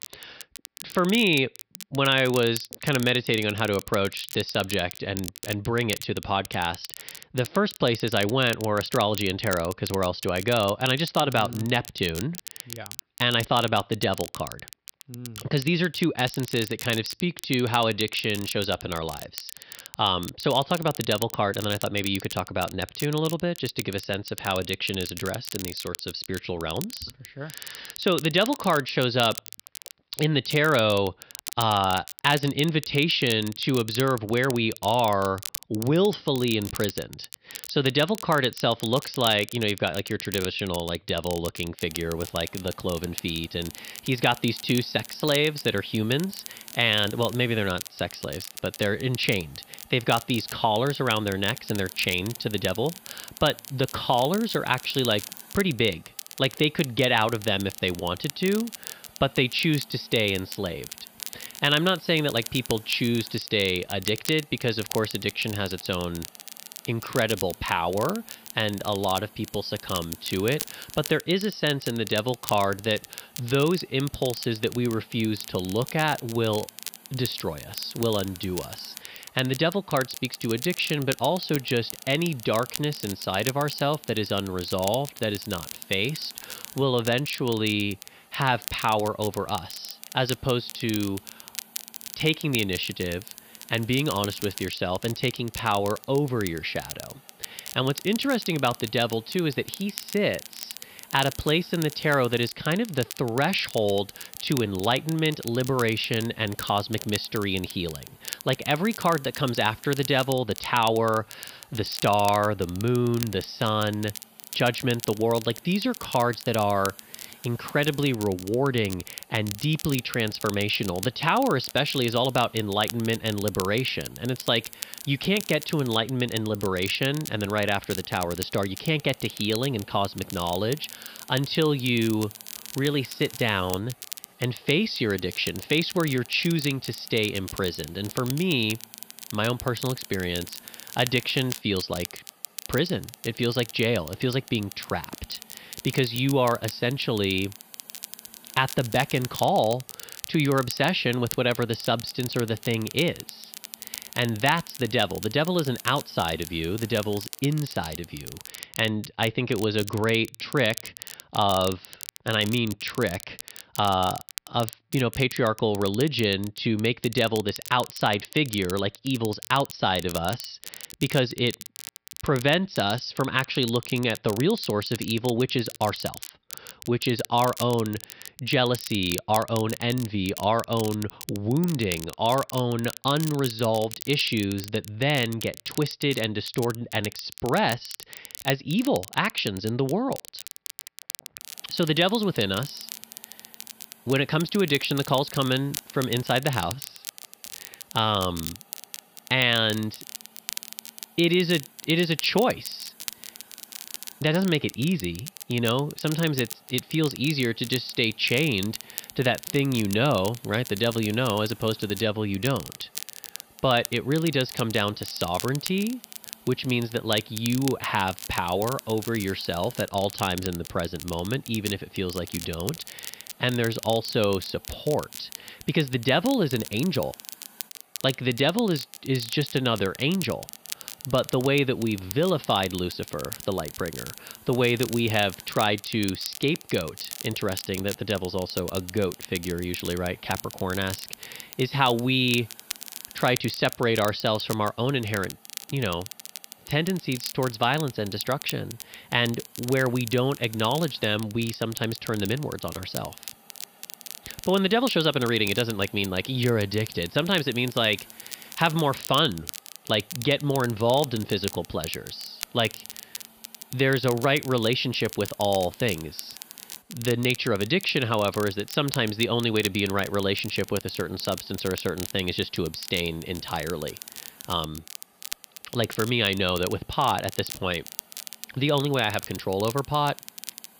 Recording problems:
high frequencies cut off; noticeable; nothing above 5.5 kHz
crackle, like an old record; noticeable; 15 dB below the speech
hiss; faint; from 42 s to 2:38 and from 3:11 on; 25 dB below the speech

